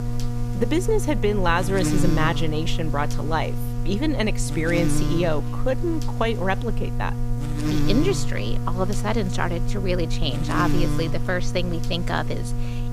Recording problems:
electrical hum; loud; throughout; 60 Hz, 8 dB below the speech

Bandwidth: 14.5 kHz